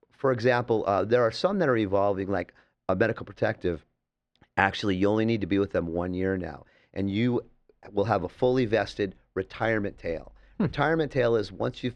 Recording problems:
muffled; slightly; fading above 2 kHz

